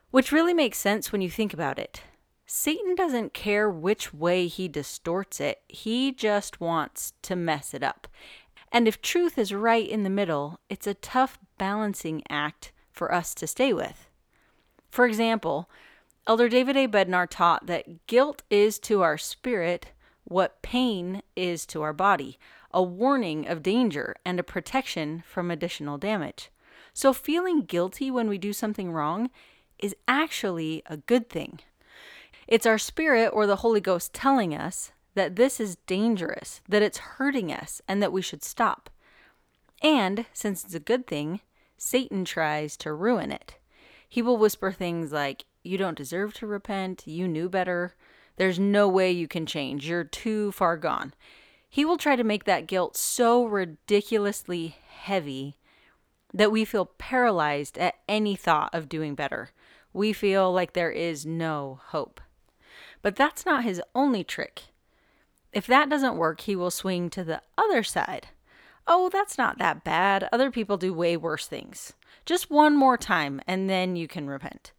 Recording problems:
none

